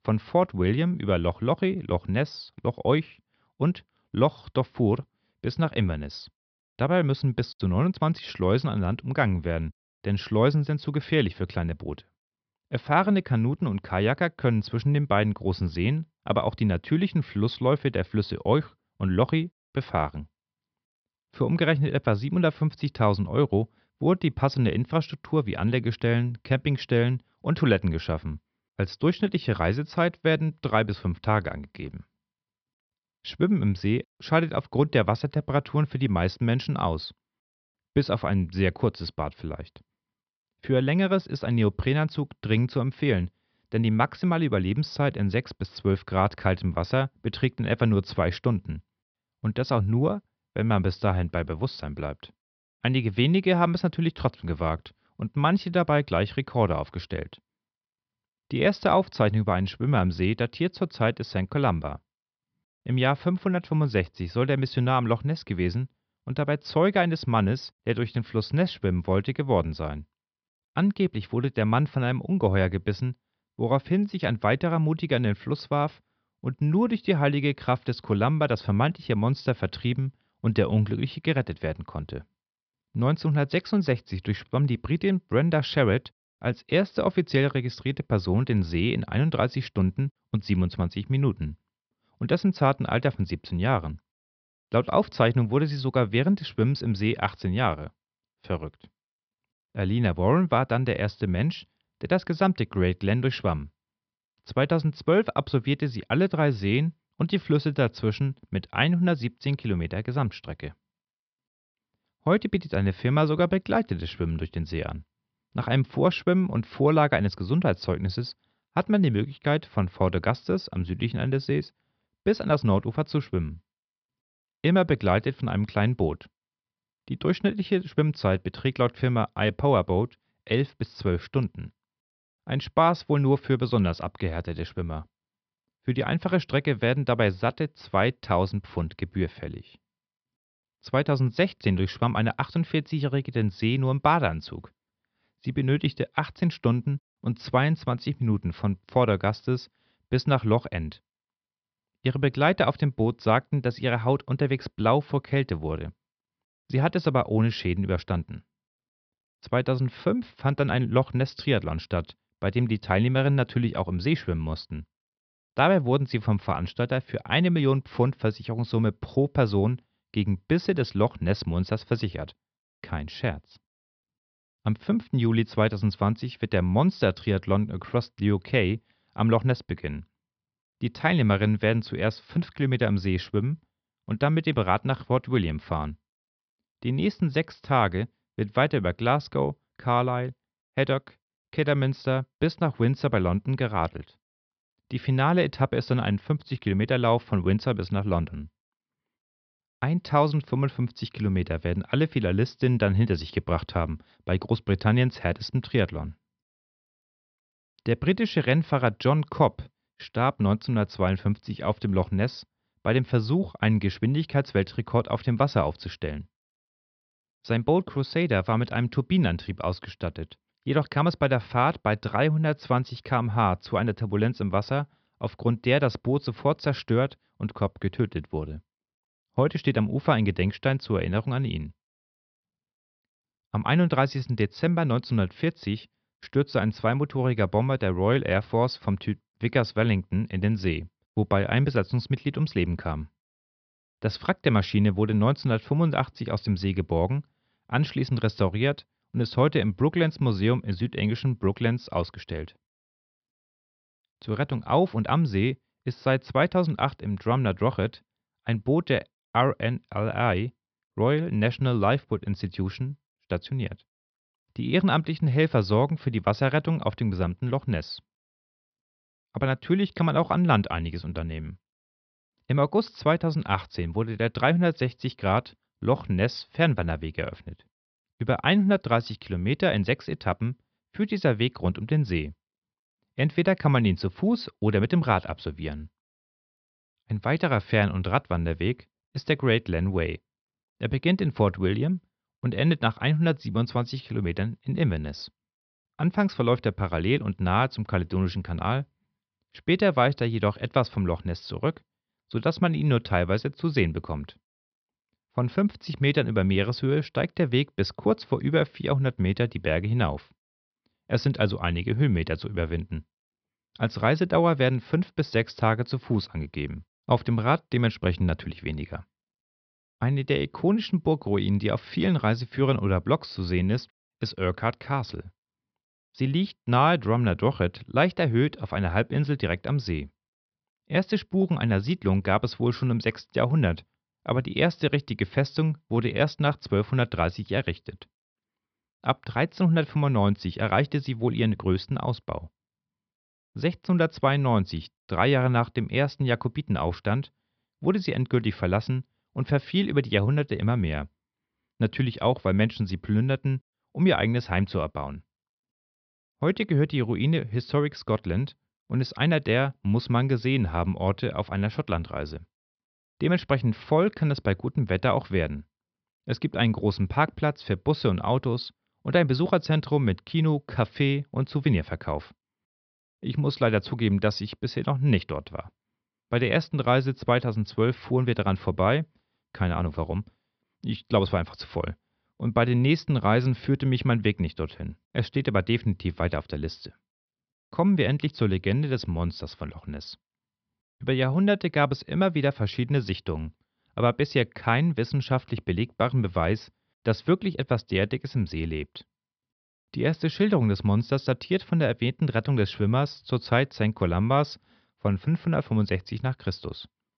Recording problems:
high frequencies cut off; noticeable; nothing above 5.5 kHz

